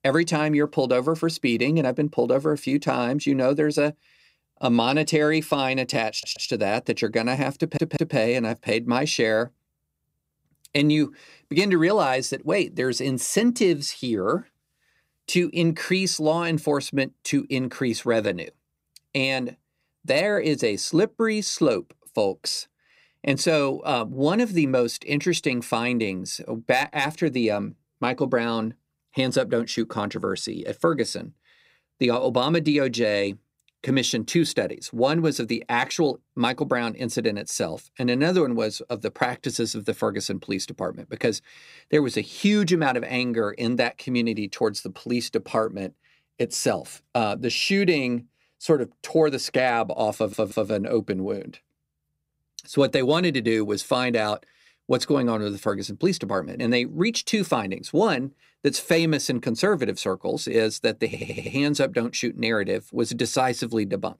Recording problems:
audio stuttering; 4 times, first at 6 s

